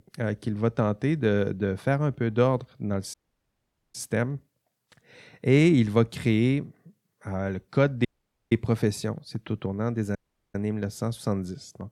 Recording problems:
audio cutting out; at 3 s for 1 s, at 8 s and at 10 s

